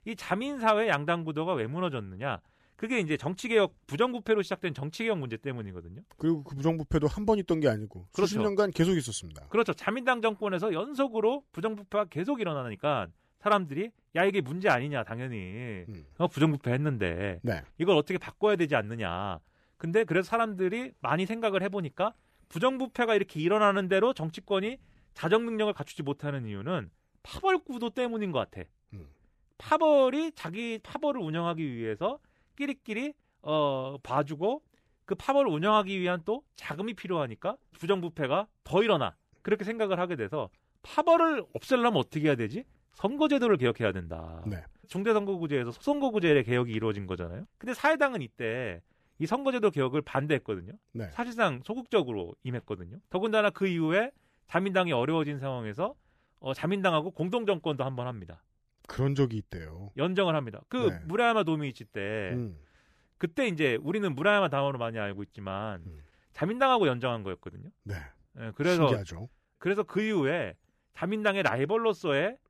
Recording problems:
none

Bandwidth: 14.5 kHz